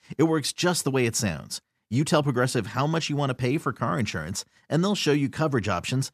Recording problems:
none

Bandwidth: 14.5 kHz